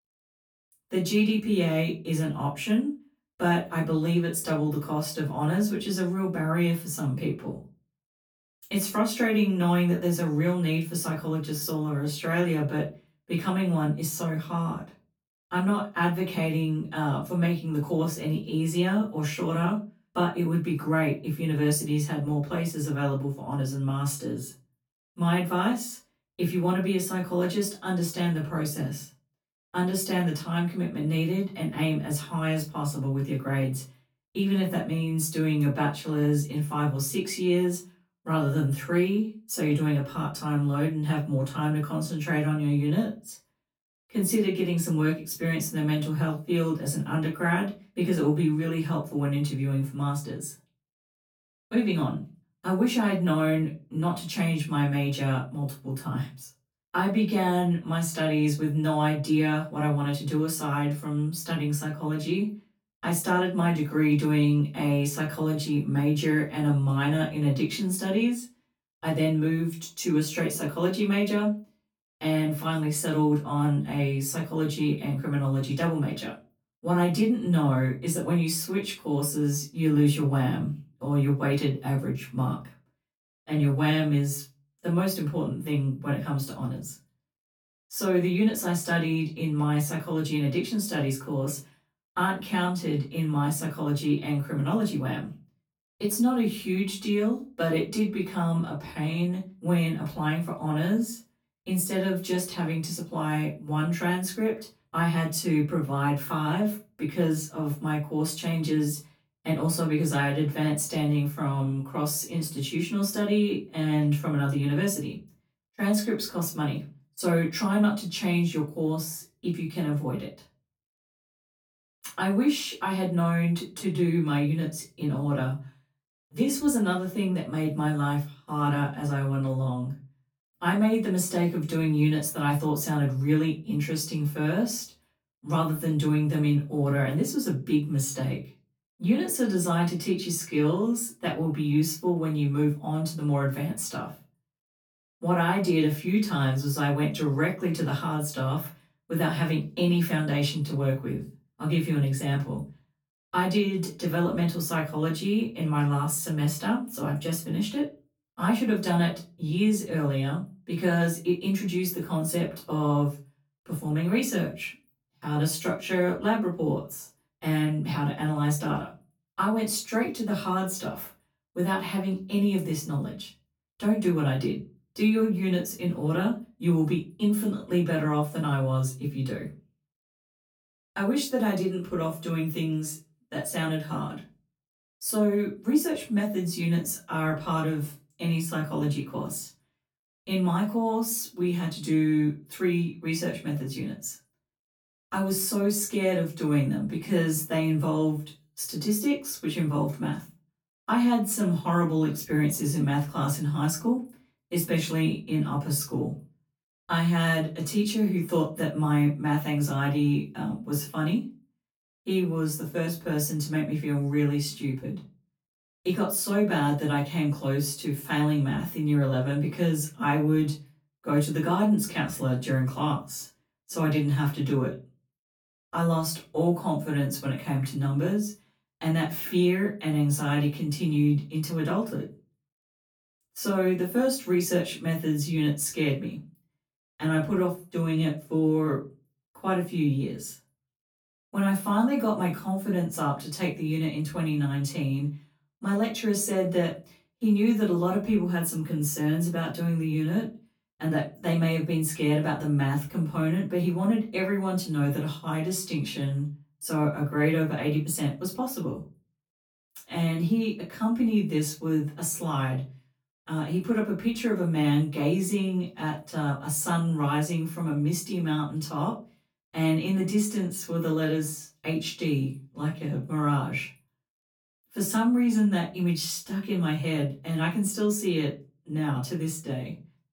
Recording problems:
off-mic speech; far
room echo; slight; dies away in 0.3 s

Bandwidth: 18 kHz